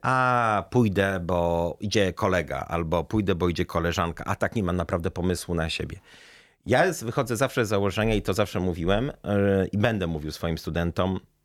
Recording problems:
none

